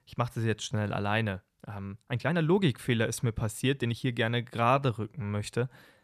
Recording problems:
uneven, jittery; strongly; from 0.5 to 5.5 s

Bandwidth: 14.5 kHz